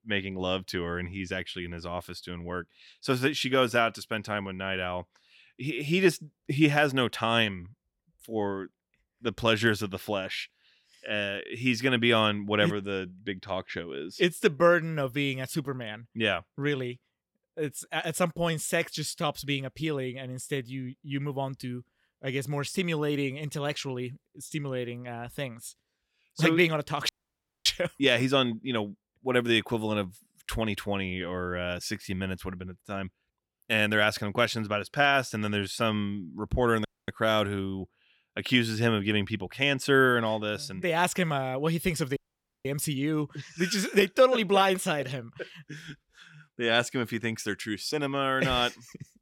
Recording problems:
audio cutting out; at 27 s for 0.5 s, at 37 s and at 42 s

